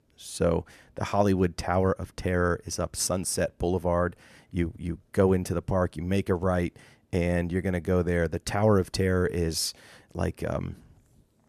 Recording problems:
none

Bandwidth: 13.5 kHz